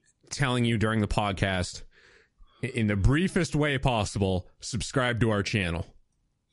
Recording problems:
garbled, watery; slightly; nothing above 11 kHz

